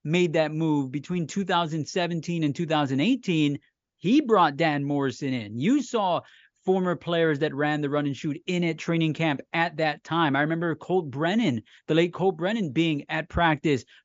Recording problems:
high frequencies cut off; noticeable; nothing above 7 kHz

